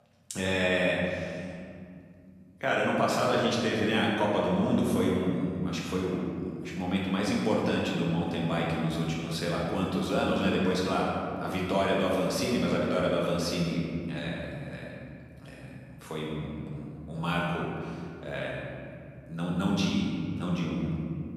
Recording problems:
room echo; strong; dies away in 2.4 s
off-mic speech; far

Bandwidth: 14 kHz